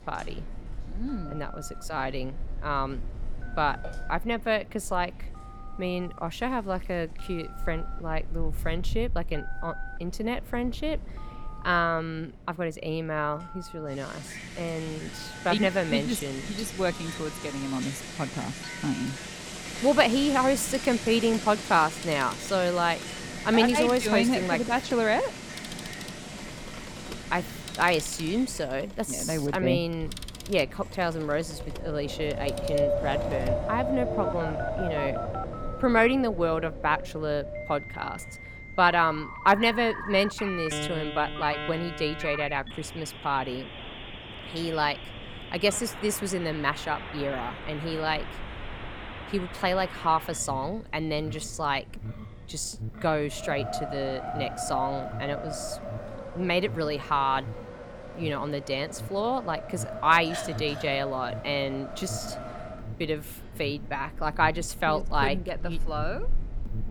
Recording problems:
alarms or sirens; noticeable; throughout; 15 dB below the speech
wind in the background; noticeable; throughout; 10 dB below the speech

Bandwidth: 18.5 kHz